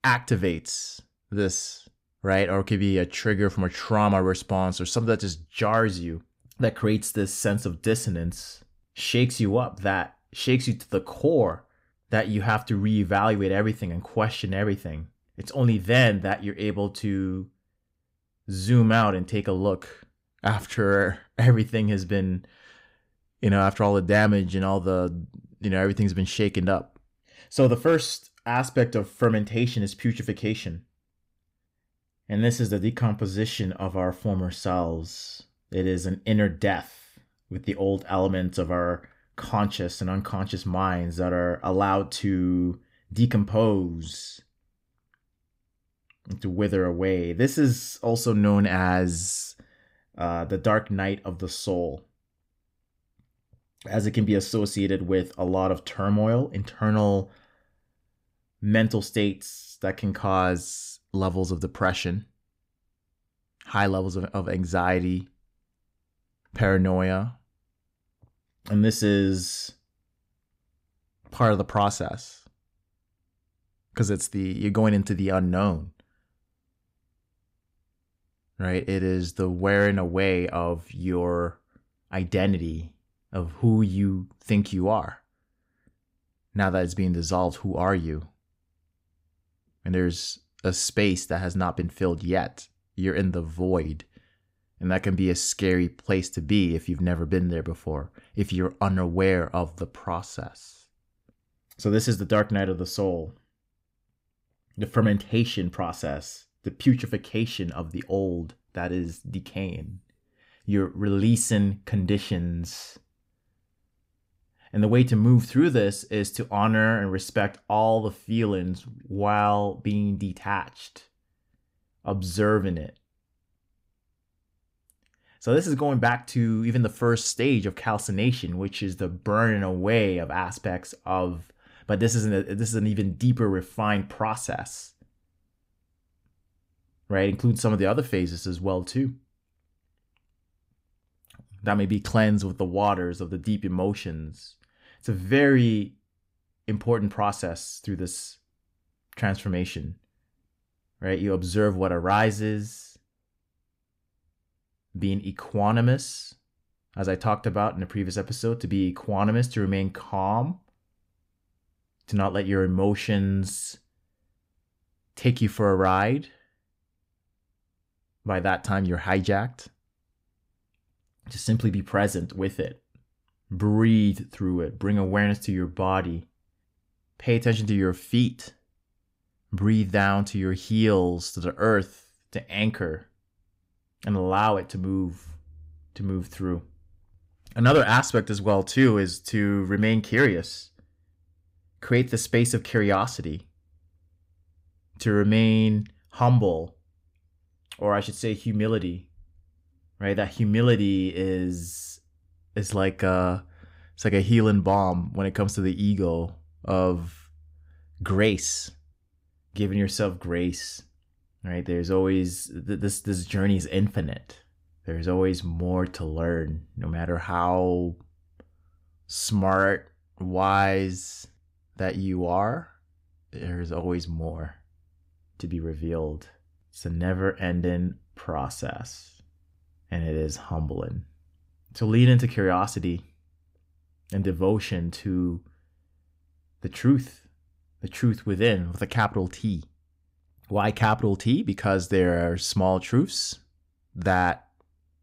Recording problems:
none

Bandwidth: 15.5 kHz